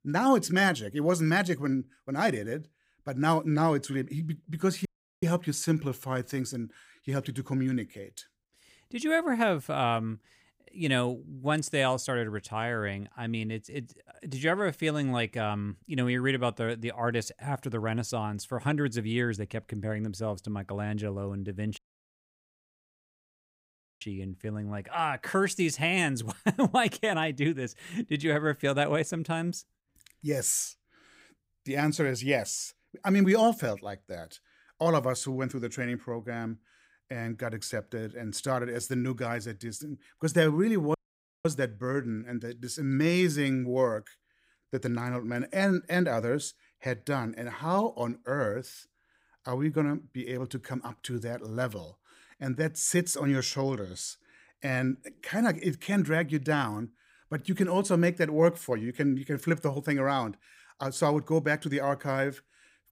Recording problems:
audio cutting out; at 5 s, at 22 s for 2 s and at 41 s for 0.5 s

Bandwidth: 15.5 kHz